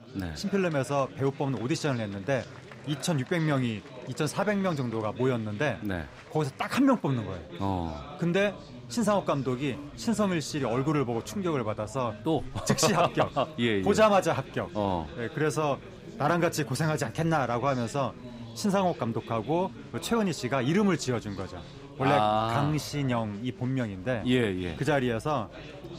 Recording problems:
chatter from many people; noticeable; throughout; 15 dB below the speech

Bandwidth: 15.5 kHz